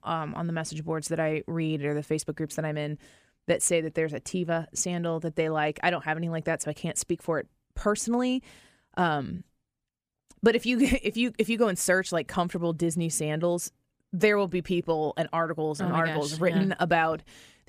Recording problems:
none

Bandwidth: 15 kHz